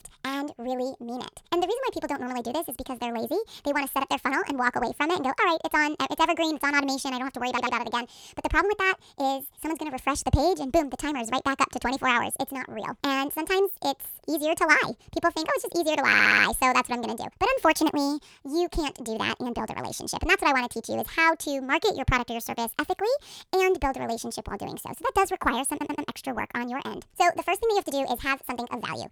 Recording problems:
wrong speed and pitch; too fast and too high; 1.5 times normal speed
audio stuttering; at 7.5 s, at 16 s and at 26 s

